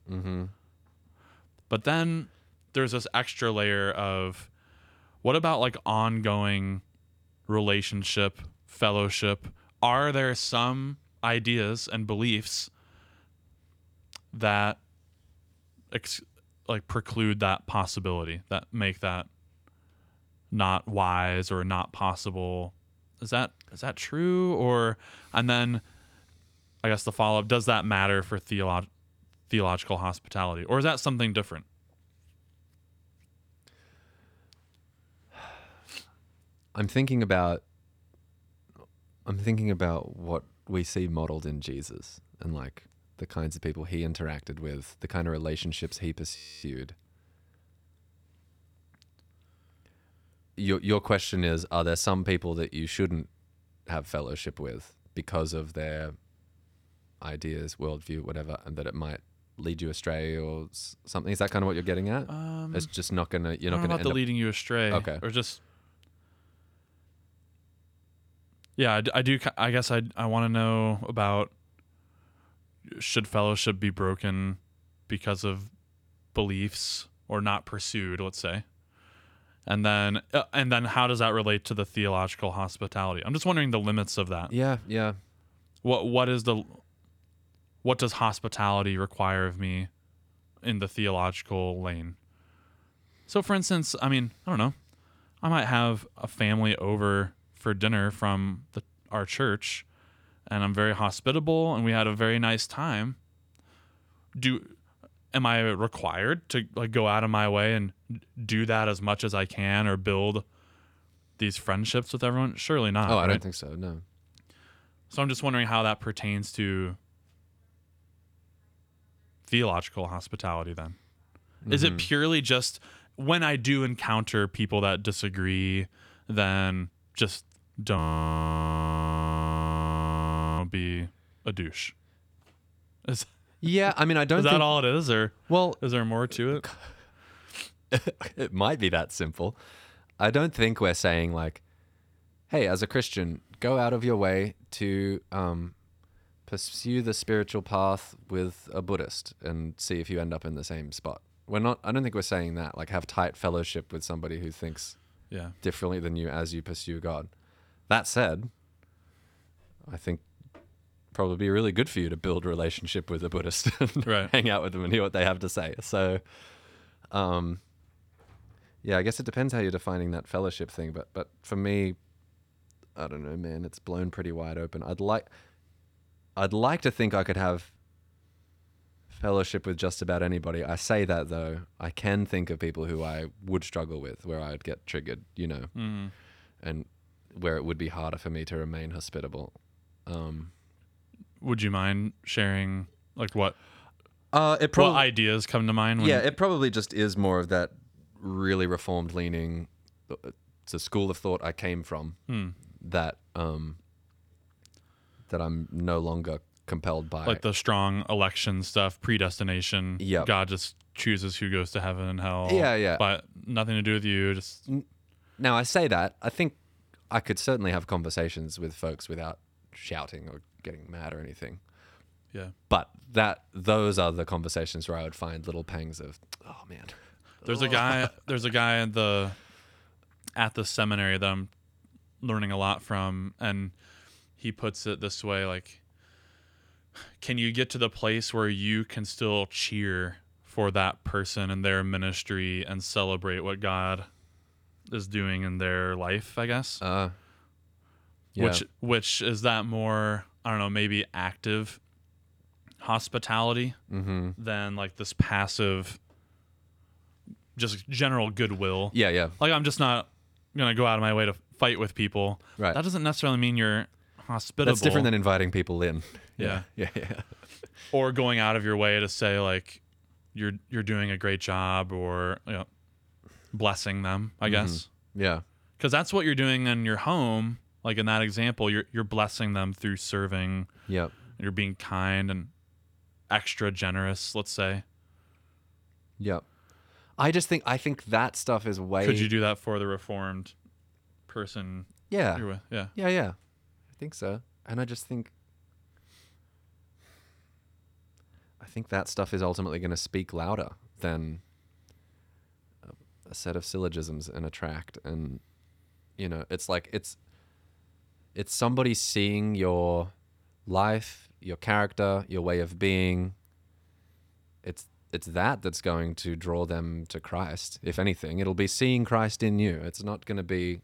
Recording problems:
audio freezing; at 46 s and at 2:08 for 2.5 s

